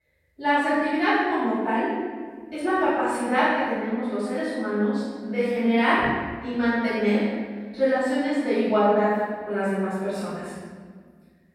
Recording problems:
room echo; strong; dies away in 1.4 s
off-mic speech; far

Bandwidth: 16 kHz